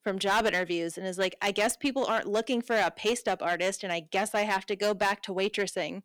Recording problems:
distortion; slight; 6% of the sound clipped

